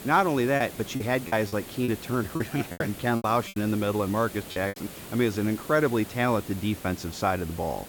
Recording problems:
hiss; noticeable; throughout; 15 dB below the speech
choppy; very; from 0.5 to 2 s, from 2.5 to 3.5 s and at 4.5 s; 19% of the speech affected

